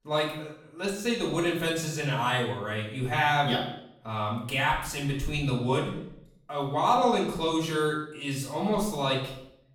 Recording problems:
off-mic speech; far
room echo; noticeable; dies away in 0.6 s

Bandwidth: 18.5 kHz